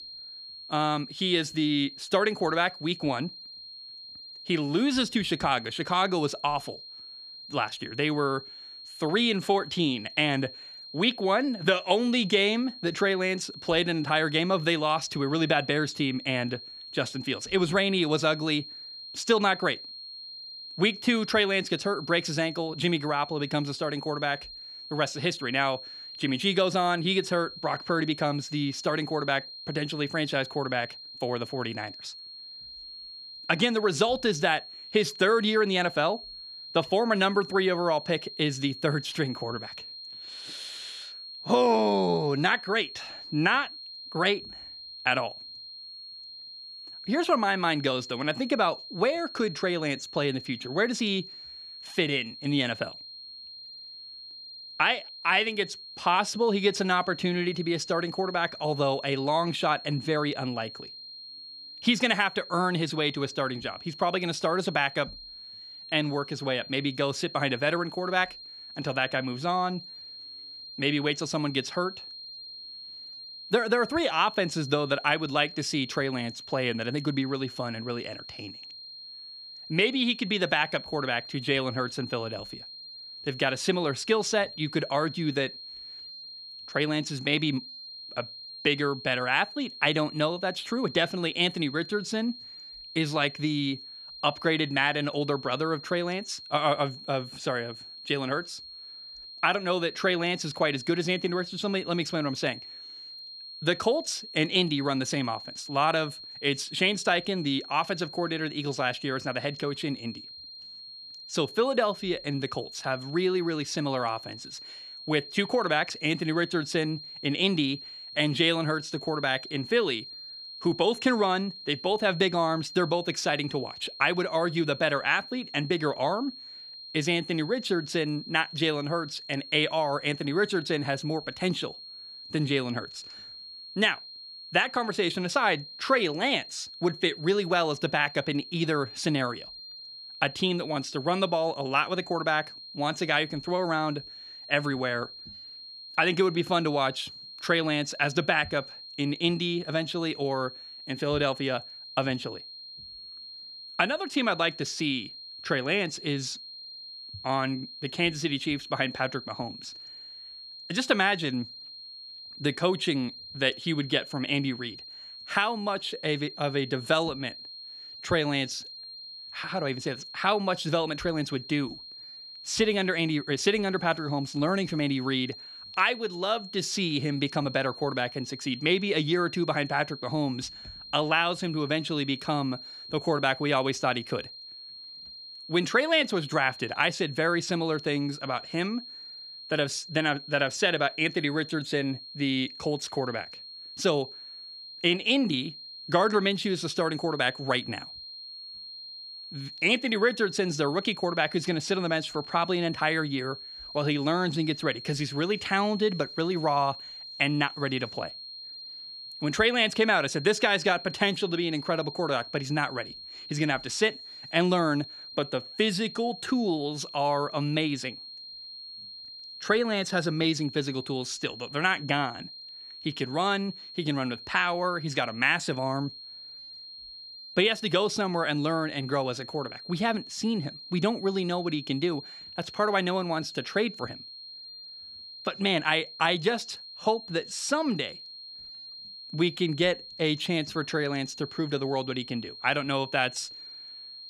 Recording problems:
high-pitched whine; noticeable; throughout; 4 kHz, 15 dB below the speech

